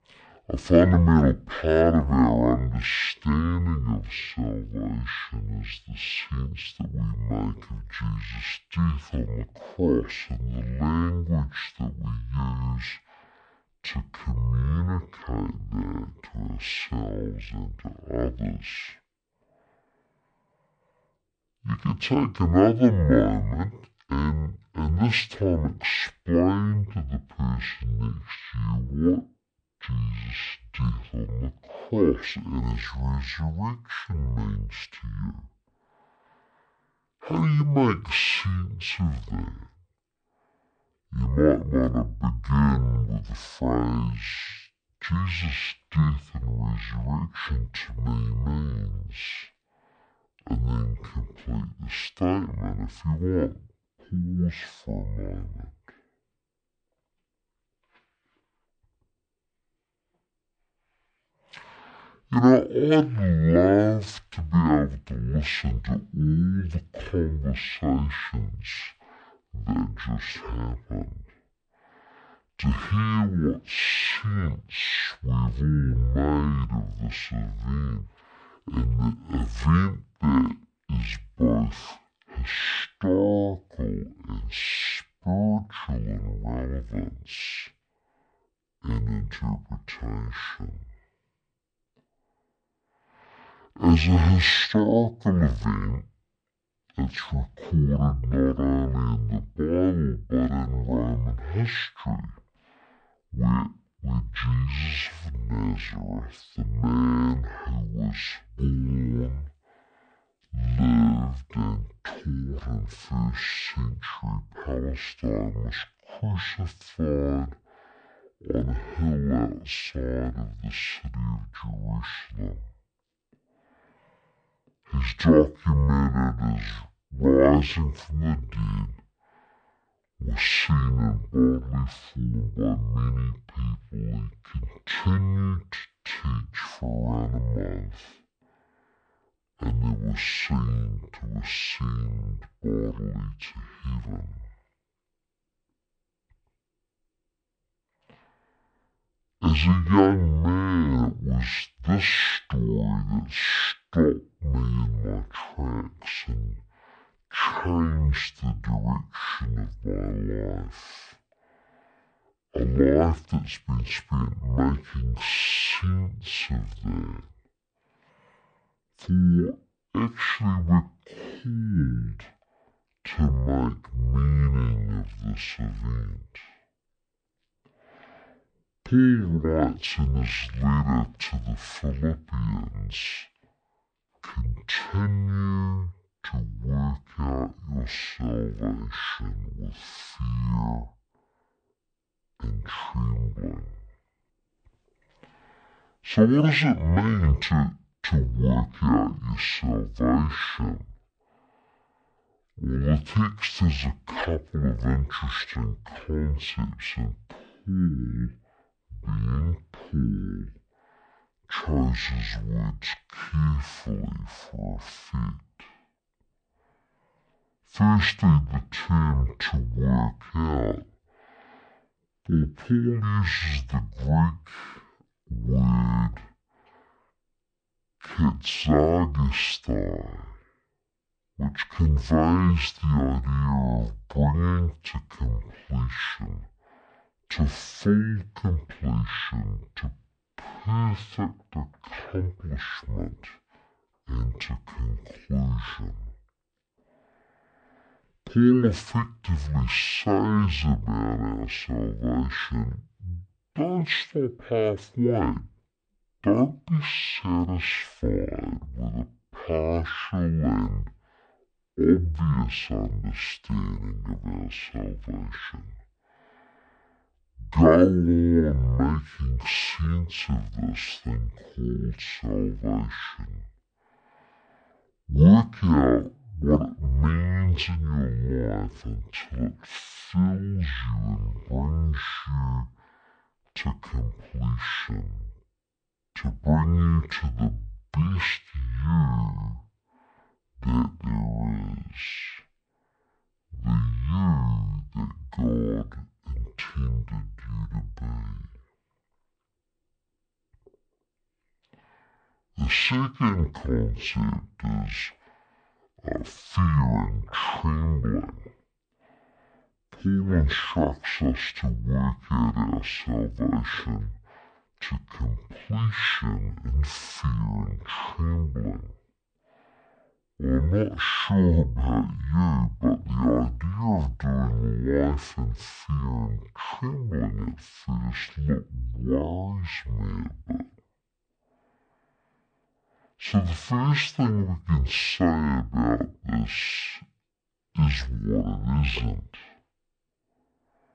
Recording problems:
wrong speed and pitch; too slow and too low; 0.5 times normal speed

